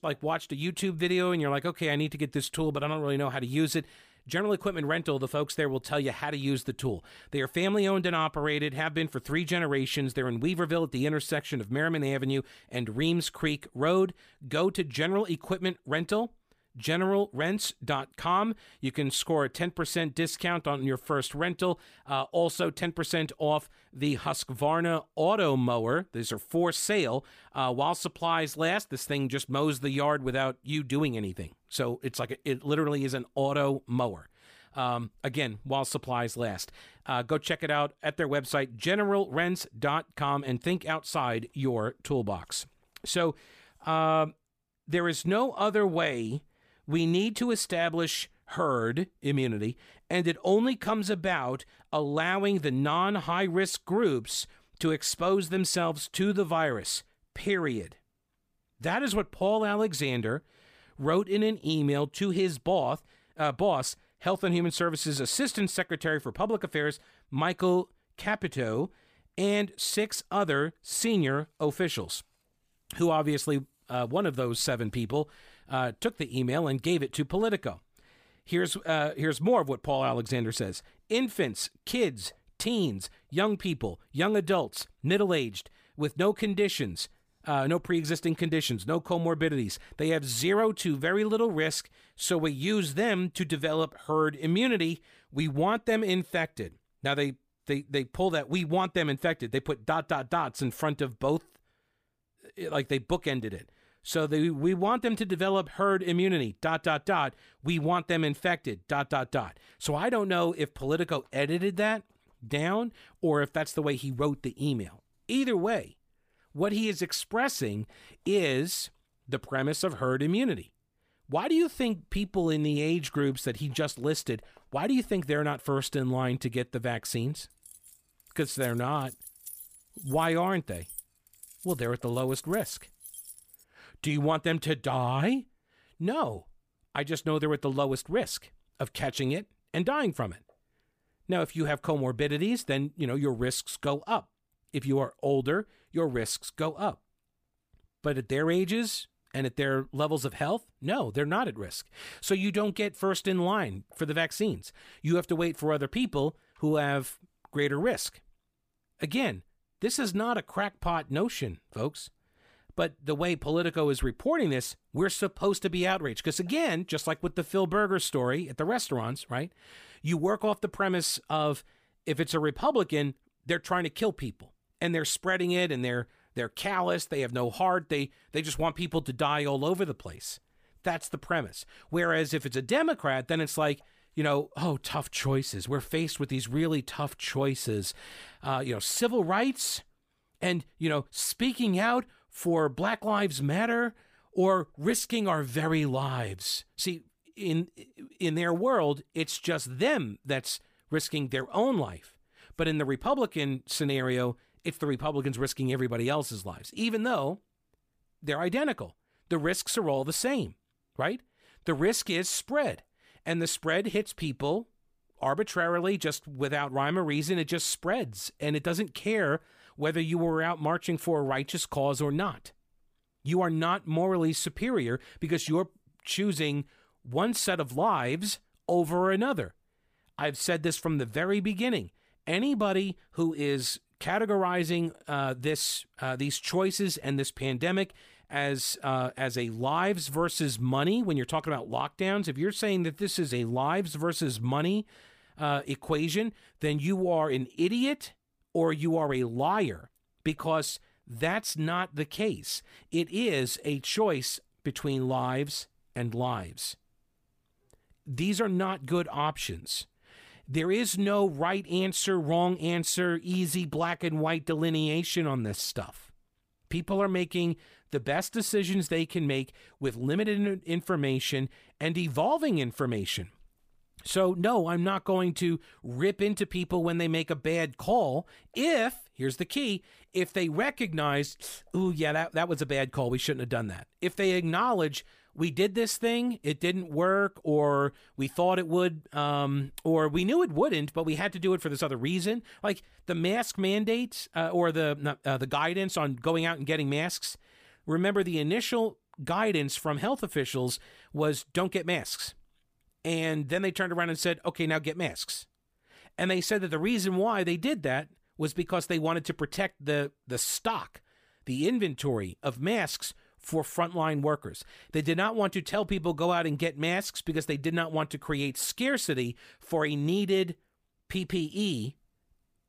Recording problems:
jangling keys; faint; from 2:08 to 2:14; peak 10 dB below the speech

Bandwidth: 15 kHz